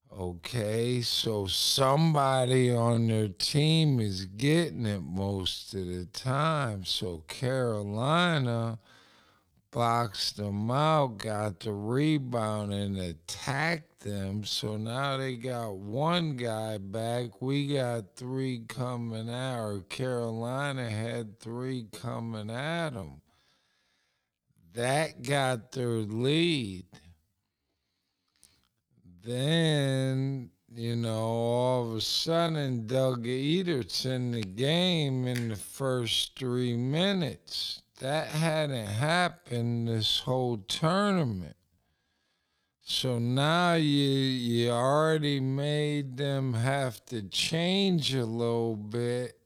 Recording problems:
wrong speed, natural pitch; too slow; 0.5 times normal speed

